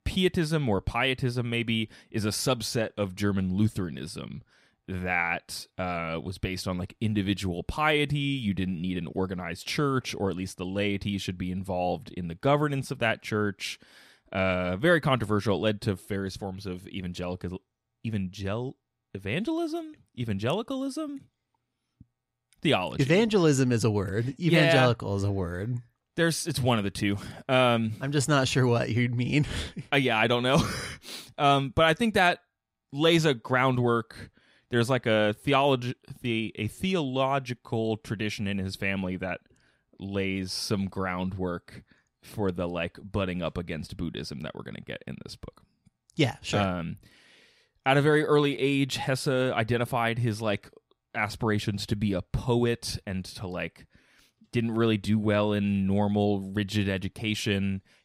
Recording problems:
none

